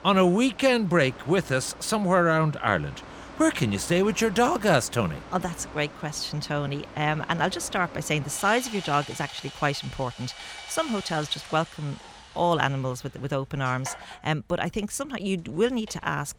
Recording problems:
machinery noise; noticeable; throughout; 15 dB below the speech

